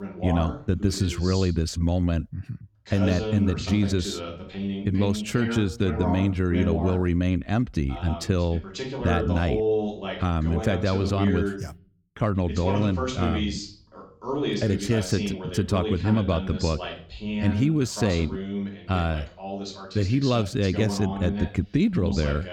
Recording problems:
voice in the background; loud; throughout; 6 dB below the speech

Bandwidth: 17.5 kHz